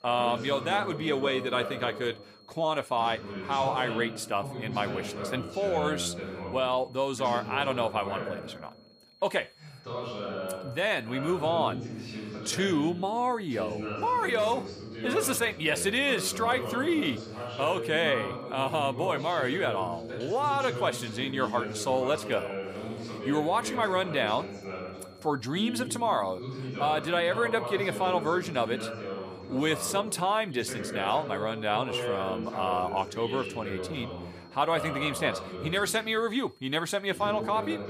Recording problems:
voice in the background; loud; throughout; 8 dB below the speech
high-pitched whine; faint; throughout; 4.5 kHz, 30 dB below the speech

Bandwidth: 14.5 kHz